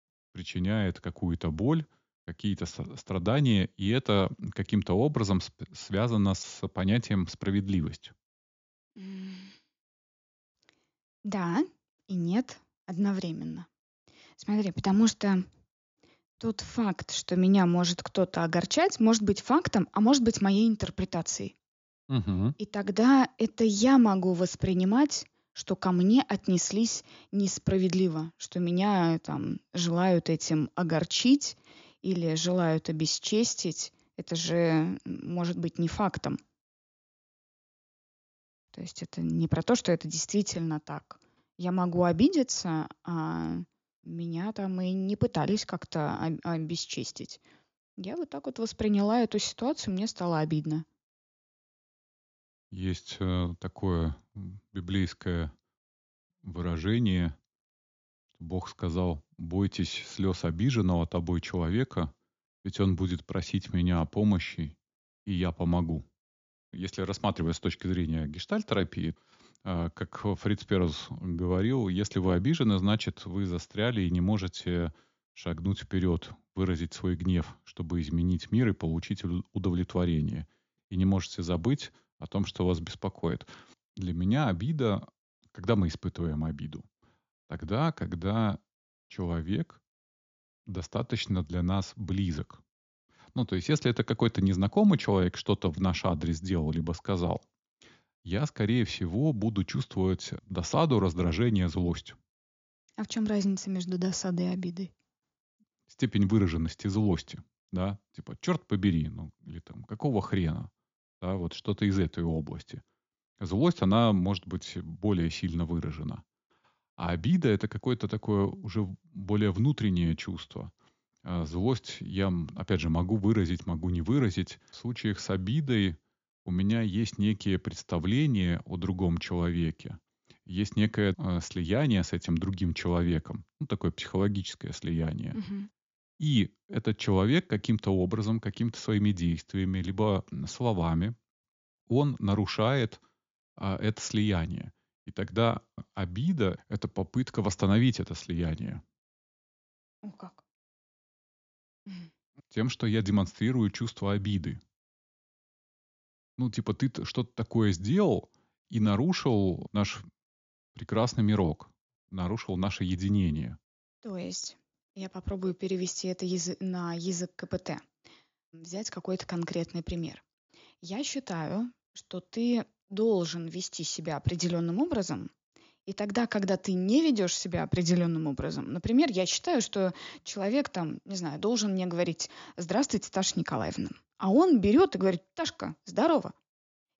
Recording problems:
high frequencies cut off; noticeable; nothing above 7 kHz

